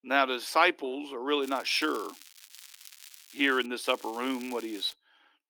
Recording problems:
thin; somewhat; fading below 300 Hz
crackling; noticeable; from 1.5 to 3.5 s and from 4 to 5 s; 20 dB below the speech

